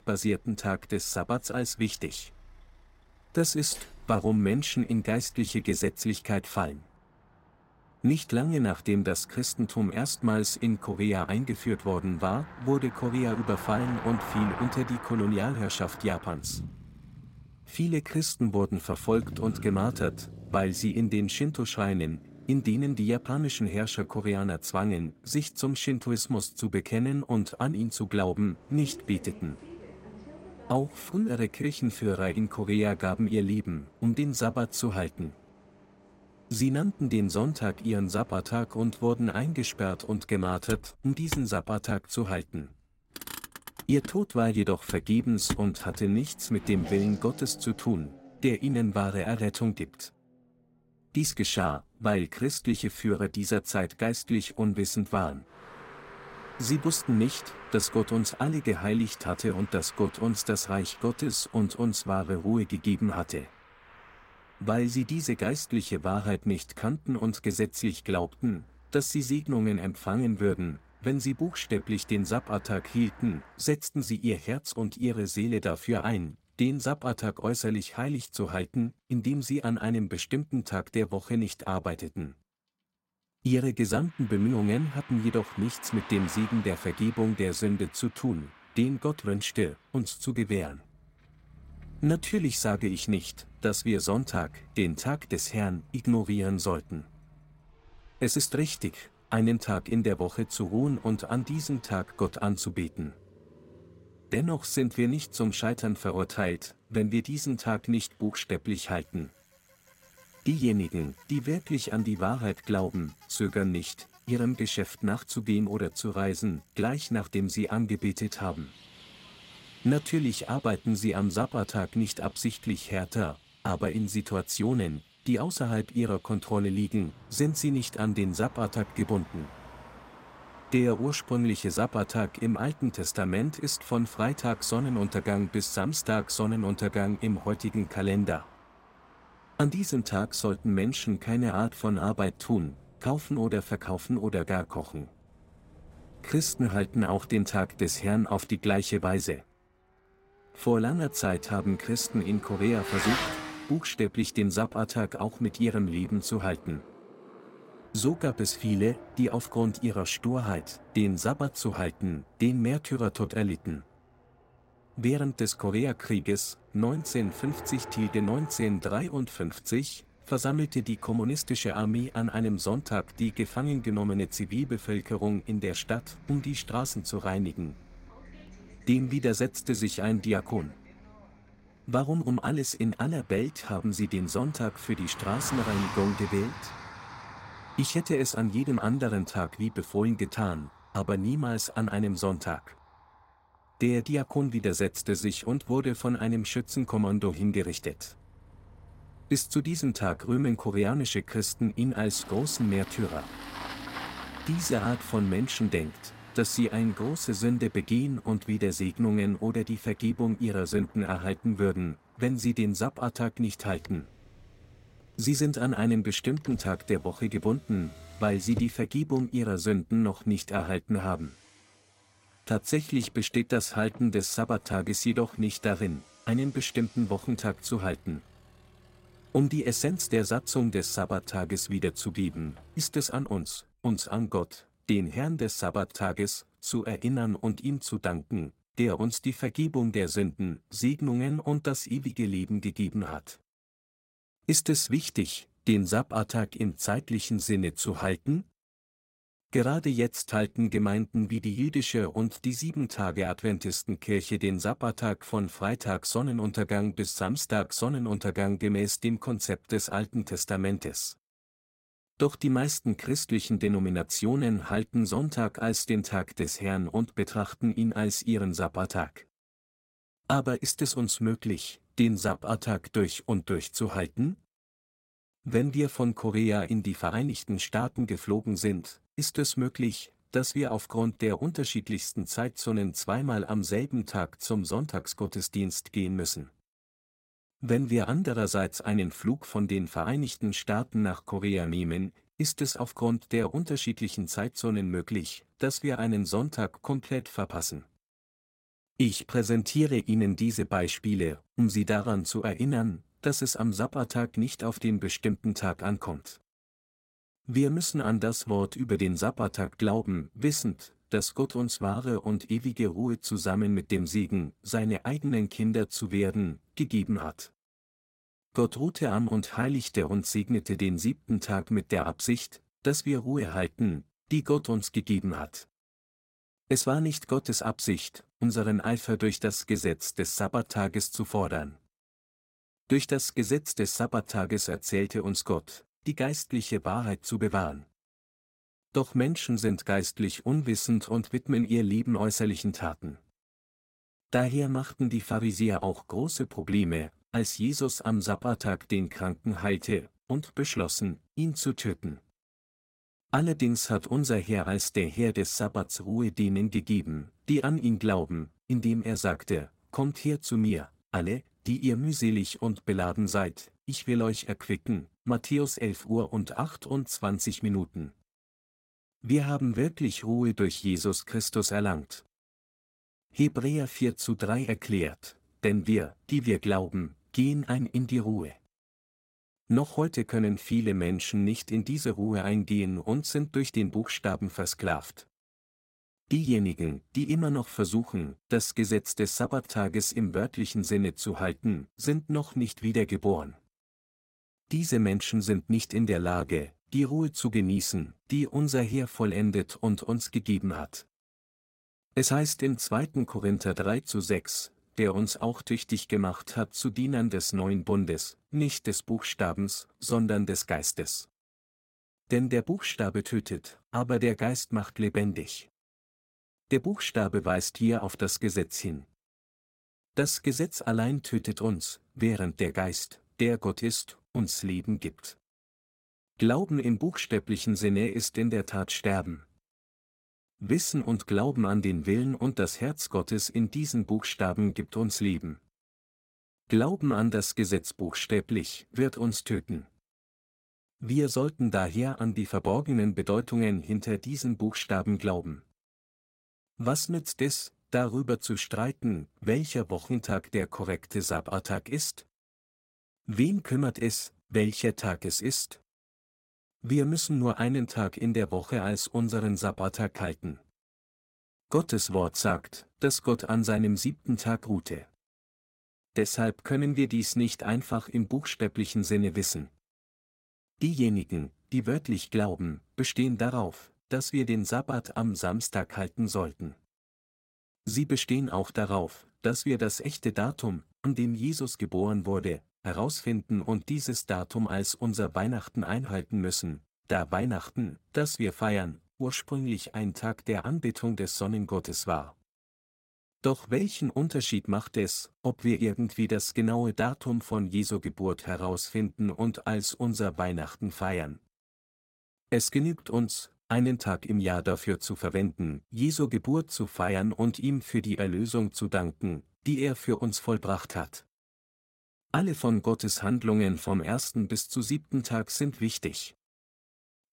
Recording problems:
traffic noise; noticeable; until 3:54; 15 dB below the speech

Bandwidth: 16 kHz